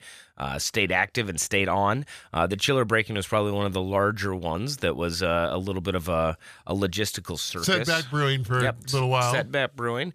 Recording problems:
none

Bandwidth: 14.5 kHz